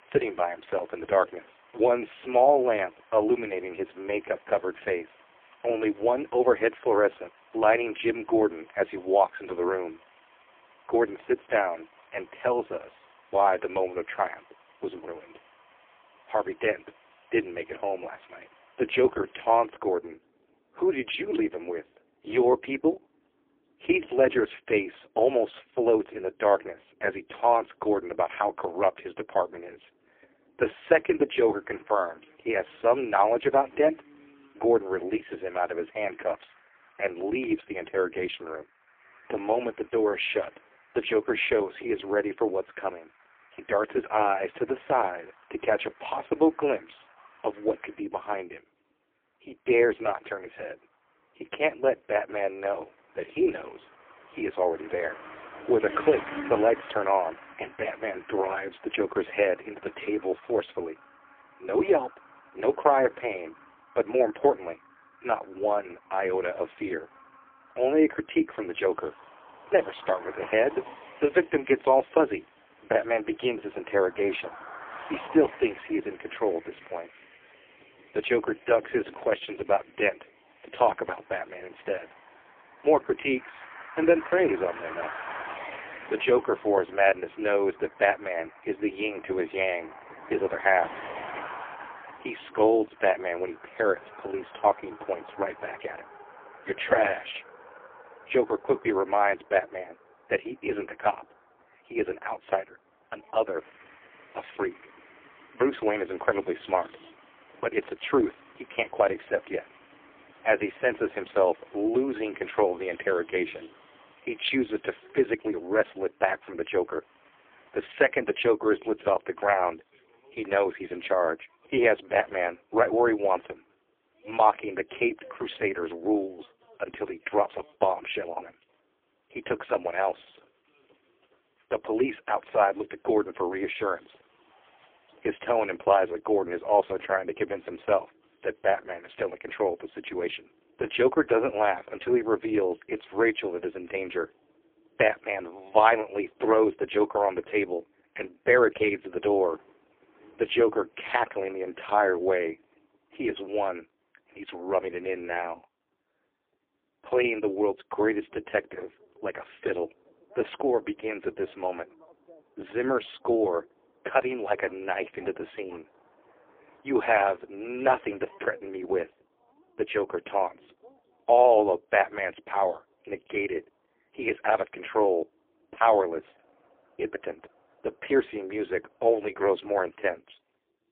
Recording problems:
phone-call audio; poor line; nothing above 3.5 kHz
traffic noise; faint; throughout; 20 dB below the speech

